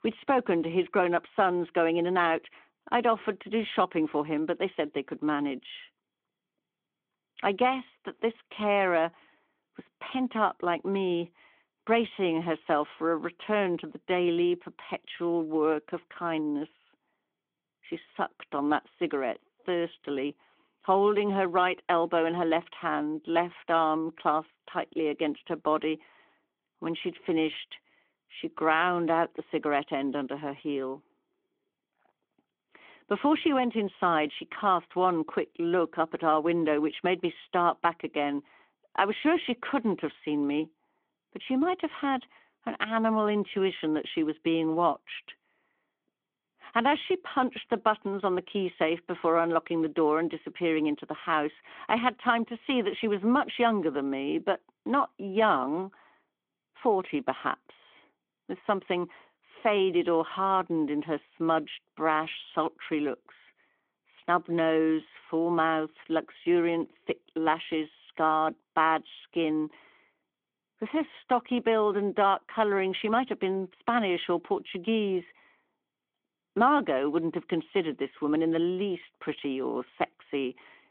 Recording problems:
phone-call audio

